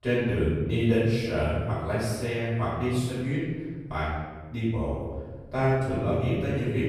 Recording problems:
room echo; strong; dies away in 1.4 s
off-mic speech; far

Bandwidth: 14.5 kHz